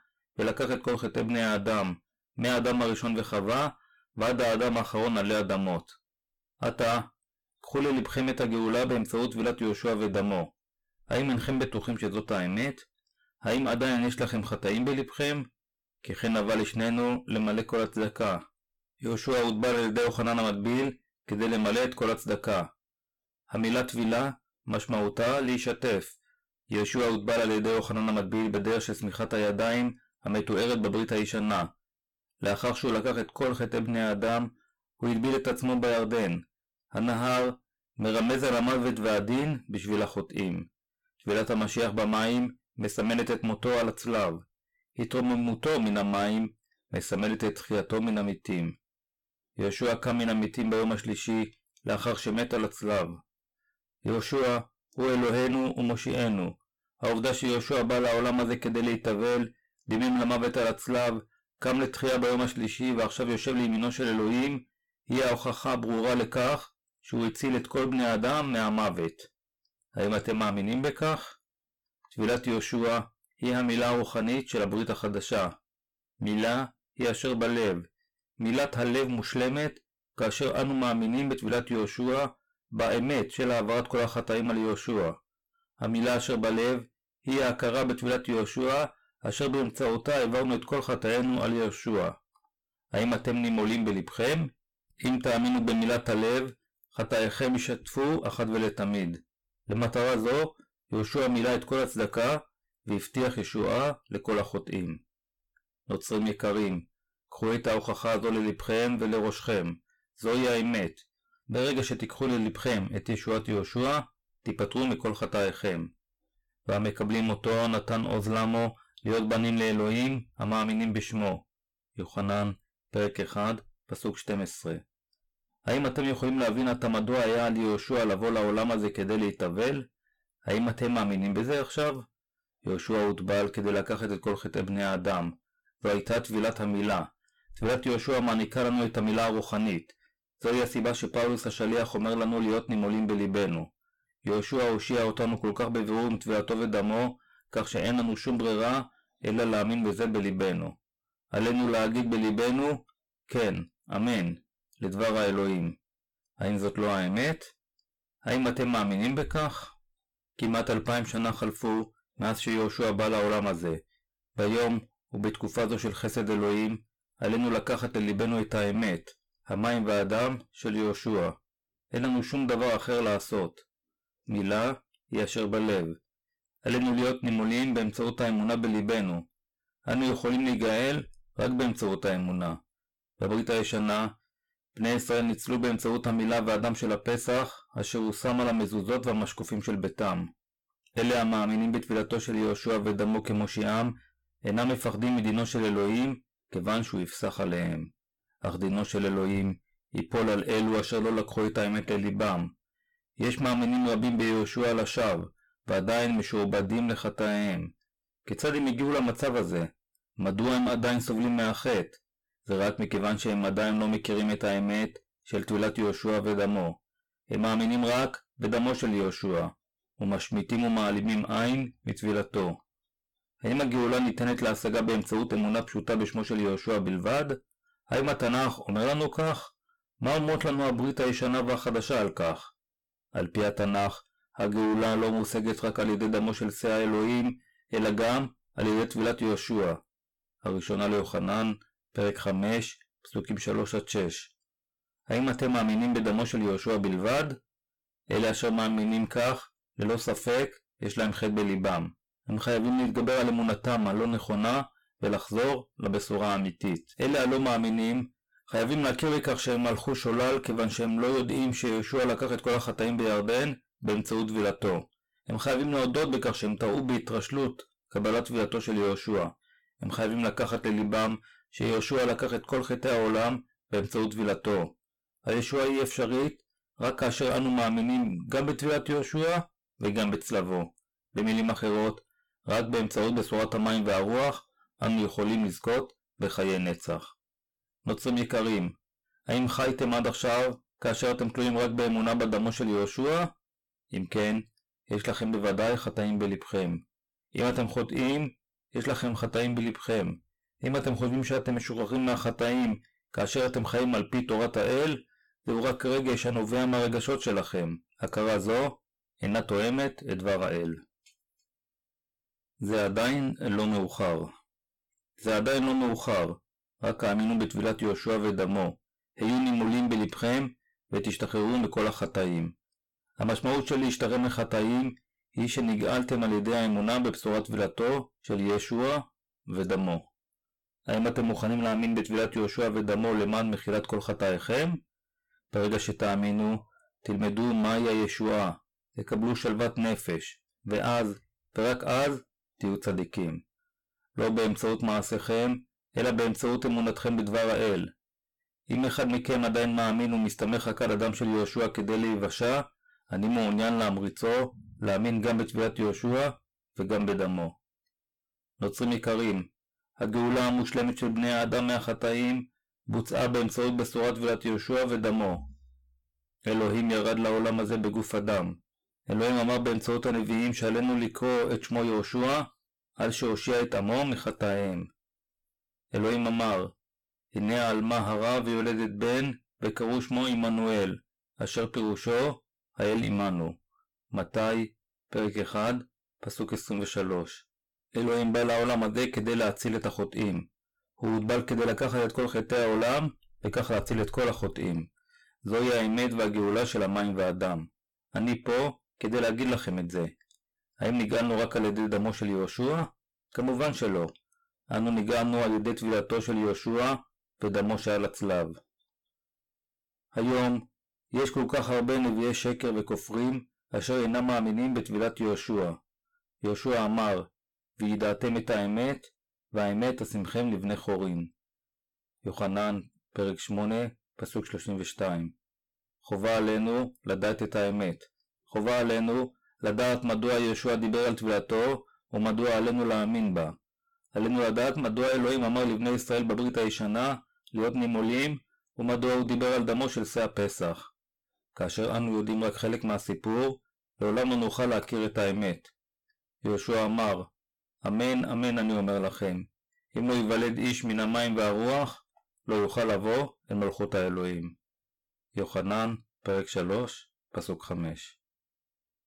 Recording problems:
distortion; heavy; 20% of the sound clipped

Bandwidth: 17 kHz